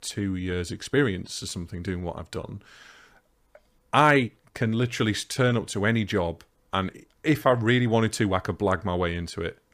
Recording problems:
uneven, jittery; strongly; from 1 to 9 s

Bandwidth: 15 kHz